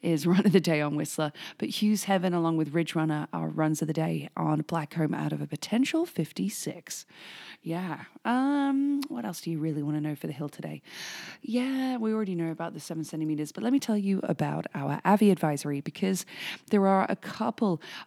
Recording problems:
none

